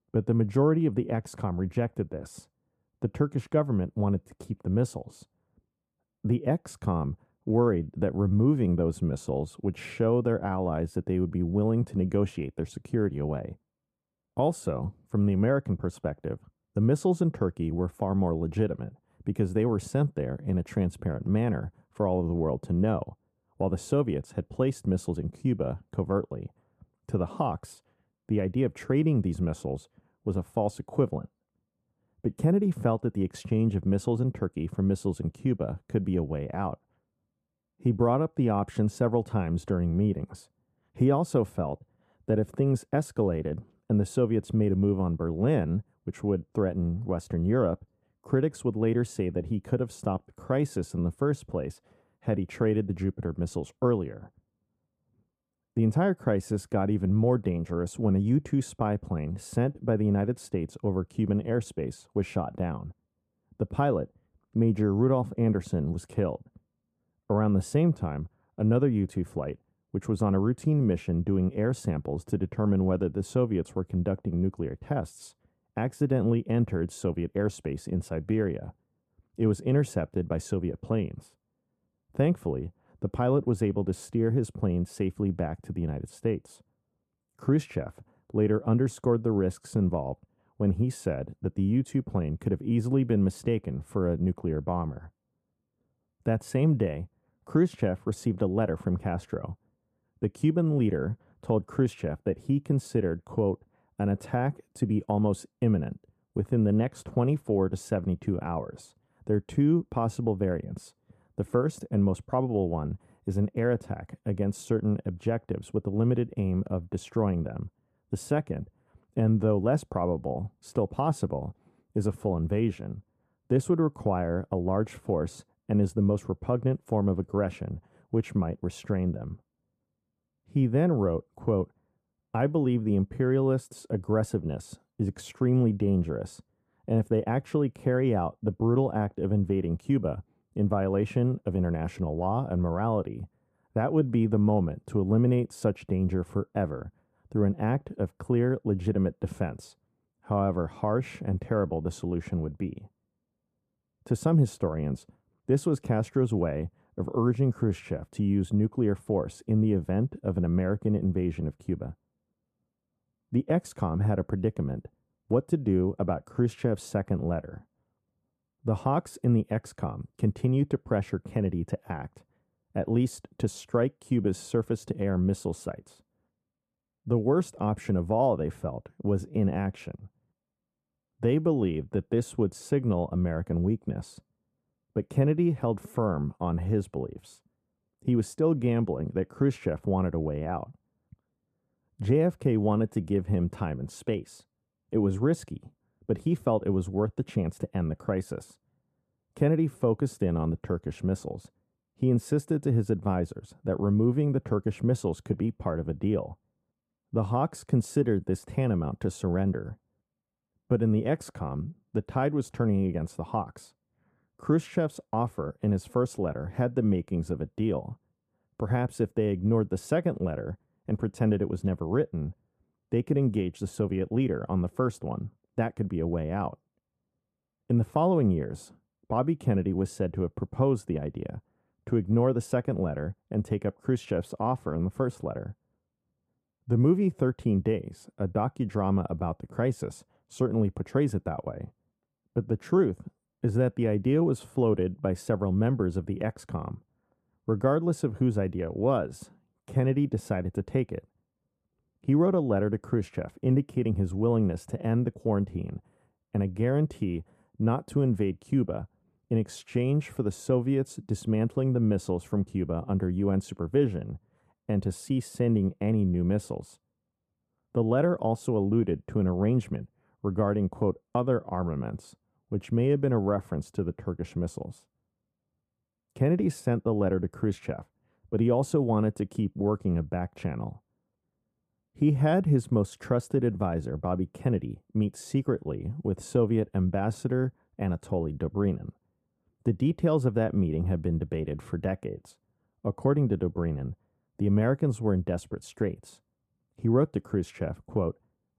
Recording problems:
muffled; very; fading above 1.5 kHz

